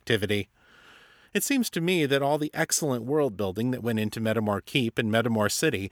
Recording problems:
none

